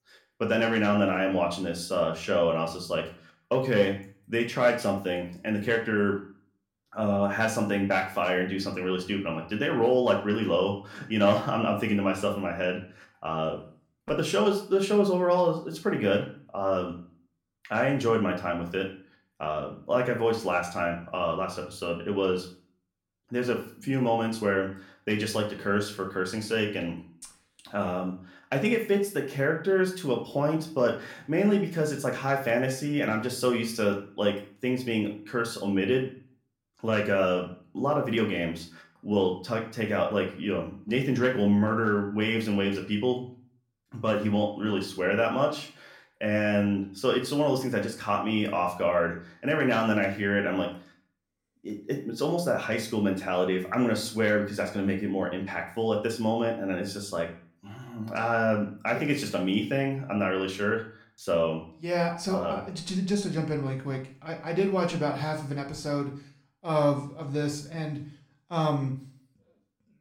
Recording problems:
room echo; slight; dies away in 0.4 s
off-mic speech; somewhat distant

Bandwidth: 17 kHz